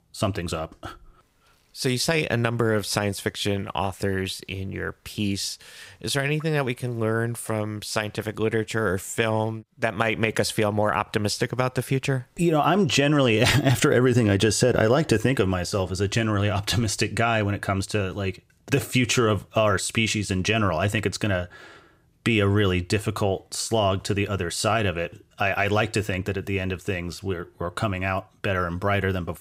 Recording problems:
none

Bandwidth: 15.5 kHz